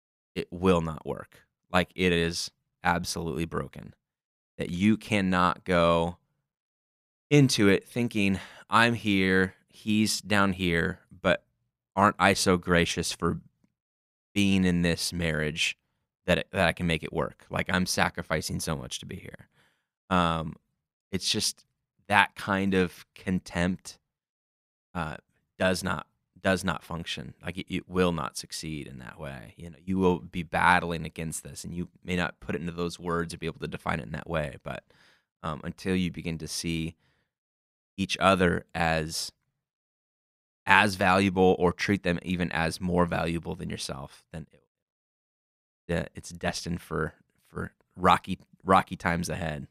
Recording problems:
none

